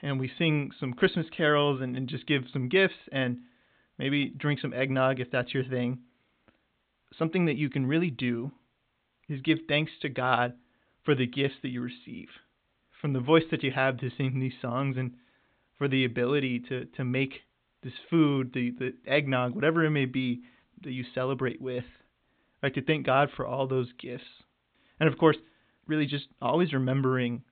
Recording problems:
high frequencies cut off; severe; nothing above 4 kHz

